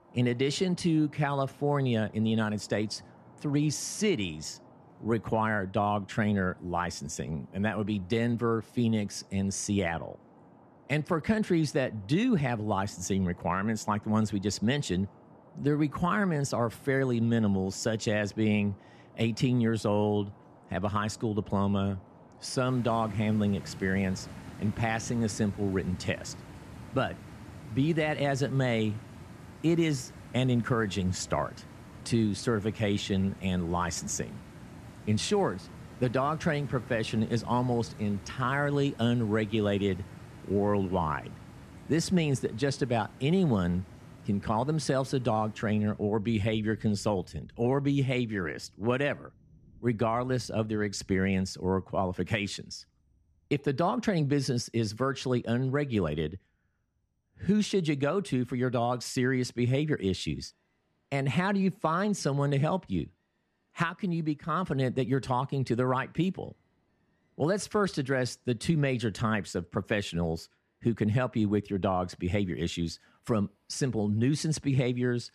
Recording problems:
rain or running water; faint; throughout; 20 dB below the speech

